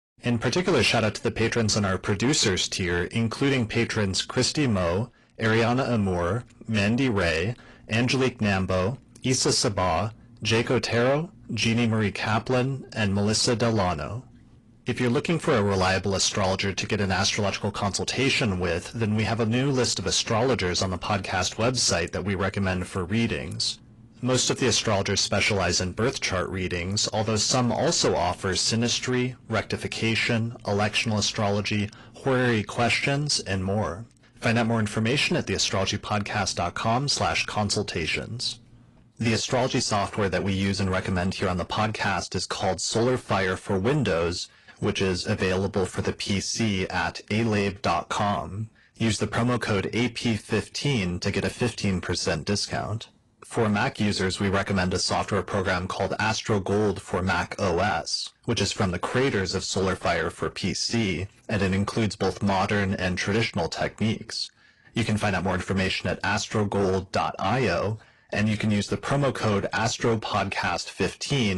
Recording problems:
distortion; slight; 10 dB below the speech
garbled, watery; slightly
abrupt cut into speech; at the end

